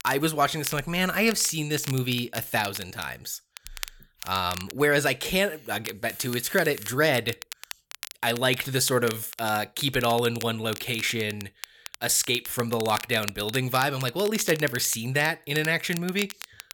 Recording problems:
crackle, like an old record; noticeable; 15 dB below the speech

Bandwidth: 17.5 kHz